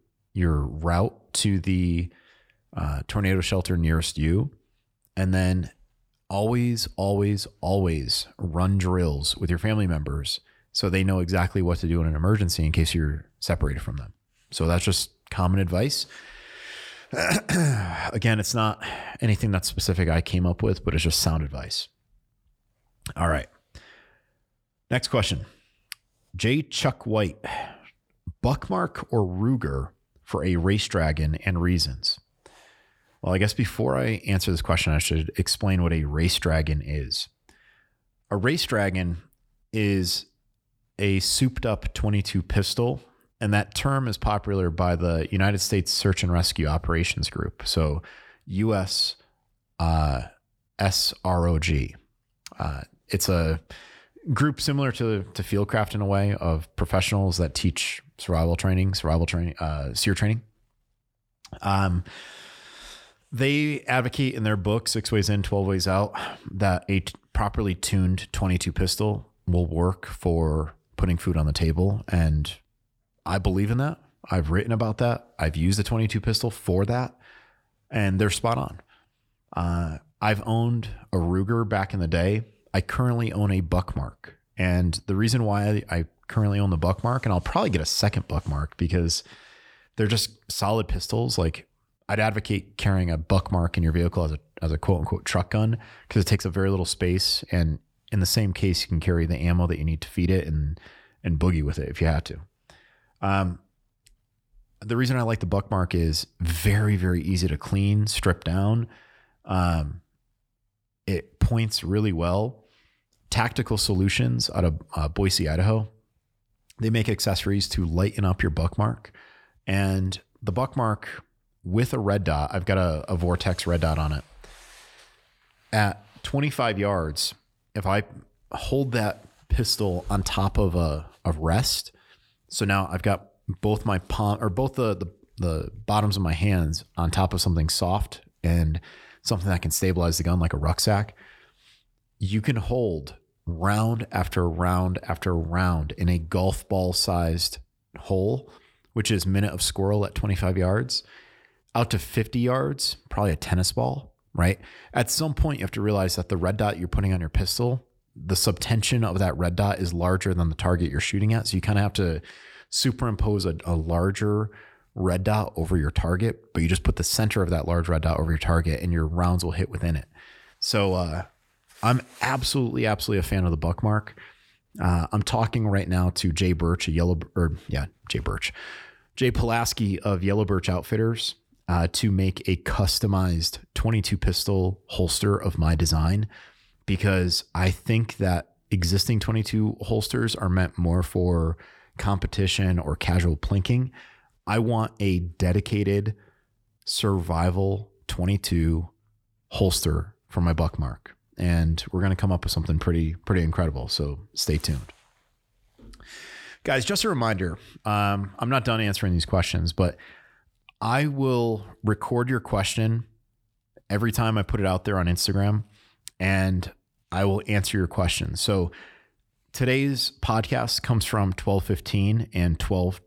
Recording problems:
none

